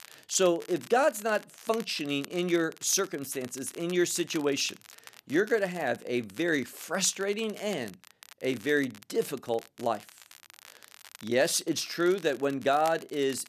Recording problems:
crackle, like an old record; faint; 20 dB below the speech

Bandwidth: 14 kHz